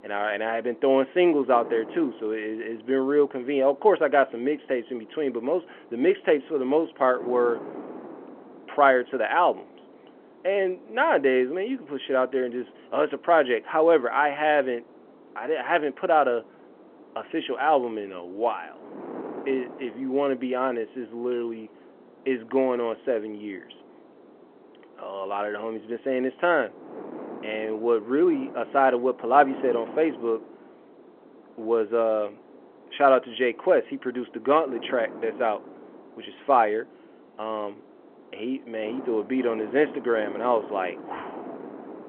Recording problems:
phone-call audio
wind noise on the microphone; occasional gusts; 20 dB below the speech

